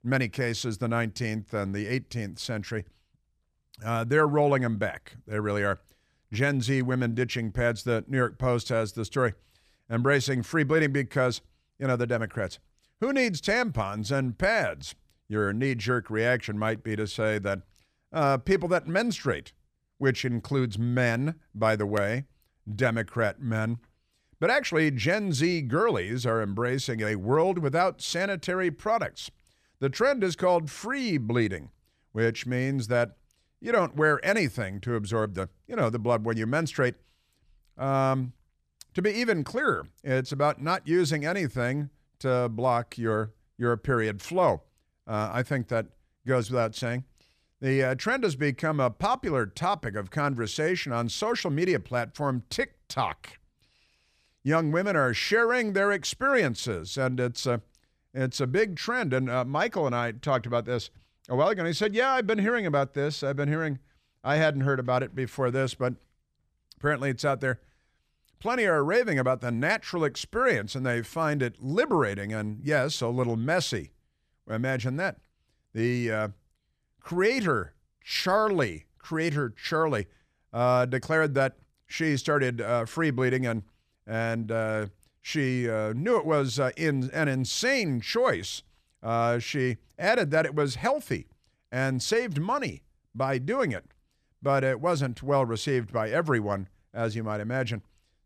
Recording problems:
none

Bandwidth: 14.5 kHz